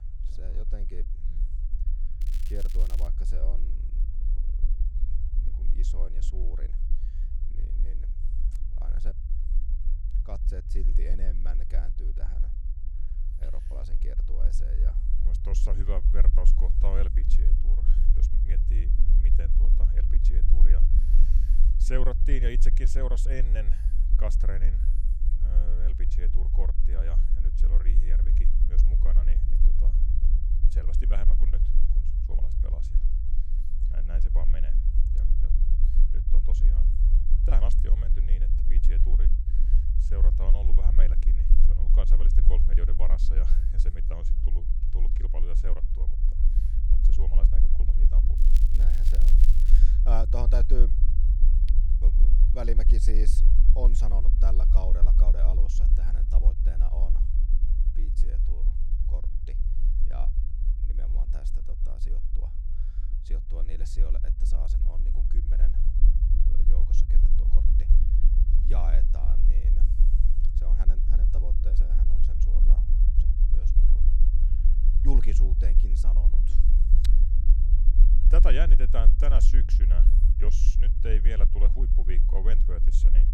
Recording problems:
low rumble; loud; throughout; 6 dB below the speech
crackling; loud; at 2 s and from 48 to 50 s; 9 dB below the speech

